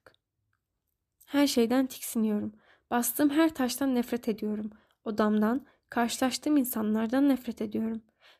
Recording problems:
none

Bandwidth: 14.5 kHz